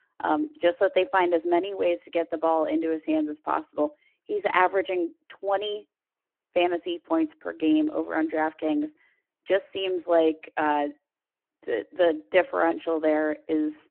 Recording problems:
phone-call audio

